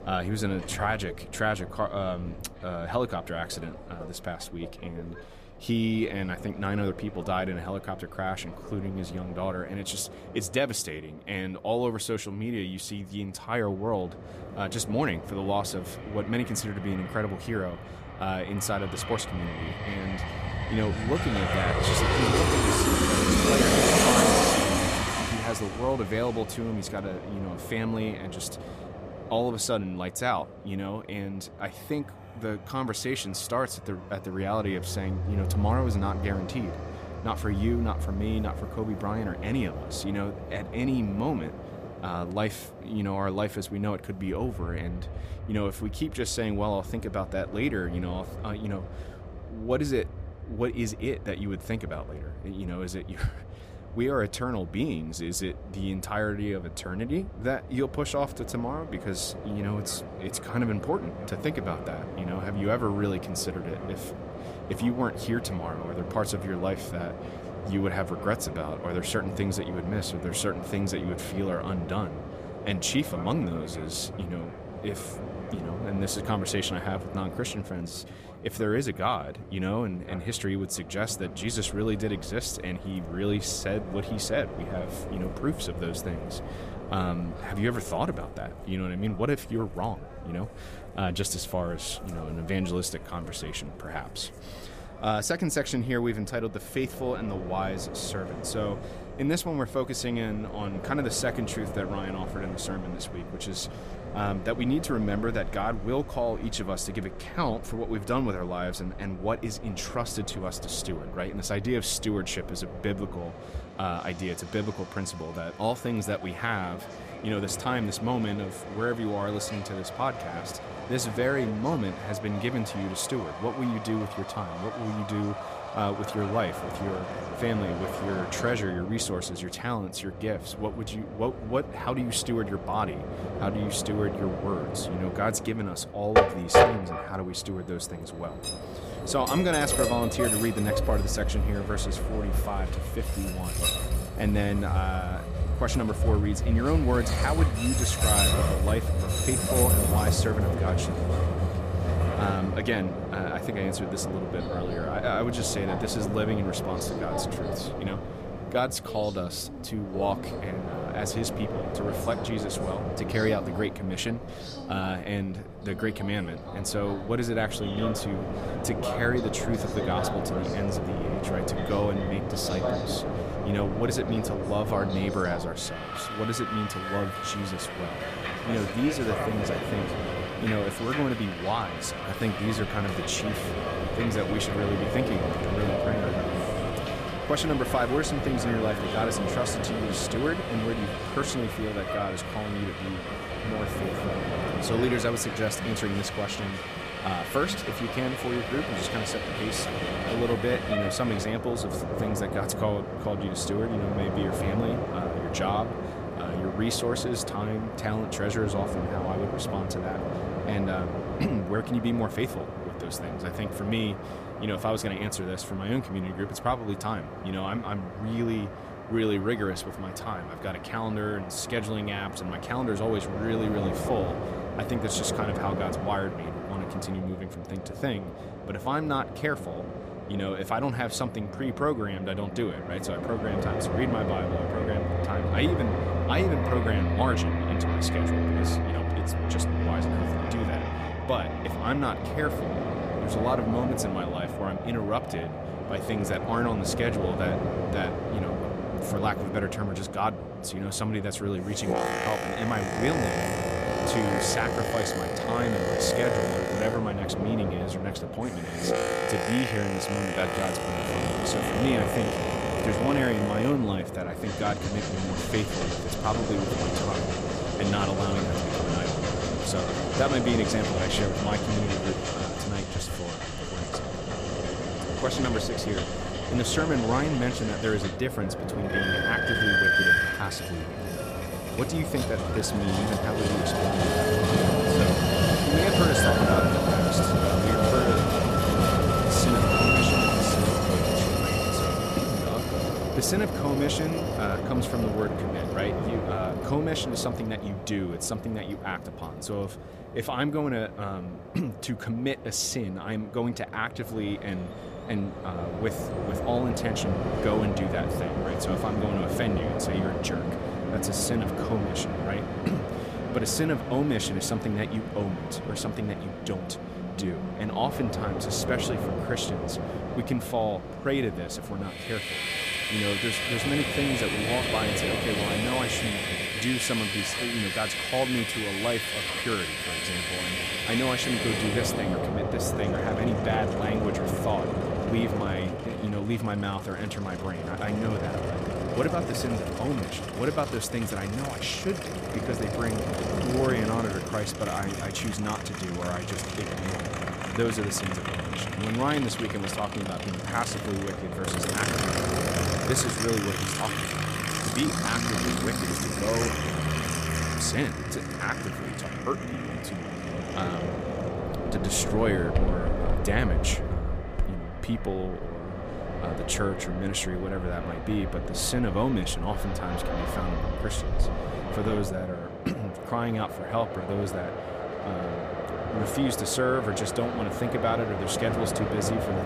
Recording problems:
train or aircraft noise; very loud; throughout; 1 dB above the speech

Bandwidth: 14.5 kHz